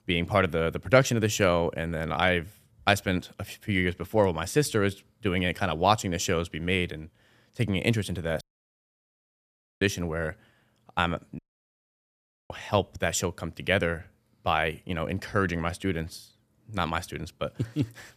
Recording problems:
audio cutting out; at 8.5 s for 1.5 s and at 11 s for 1 s

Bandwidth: 14.5 kHz